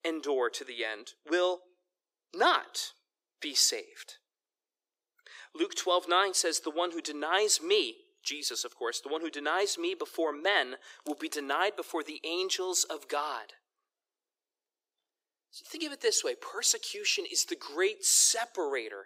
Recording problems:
thin; very; fading below 350 Hz

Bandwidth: 15.5 kHz